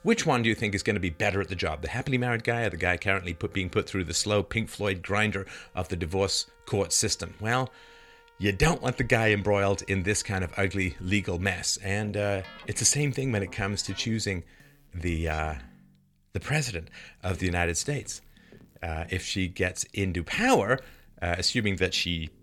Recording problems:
background music; faint; throughout; 25 dB below the speech

